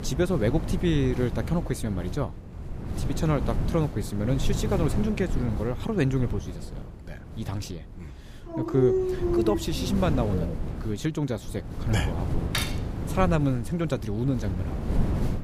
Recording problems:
wind noise on the microphone; heavy; 9 dB below the speech
dog barking; loud; from 8.5 to 11 s; peak 3 dB above the speech
clattering dishes; noticeable; at 13 s; peak 2 dB below the speech

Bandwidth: 15 kHz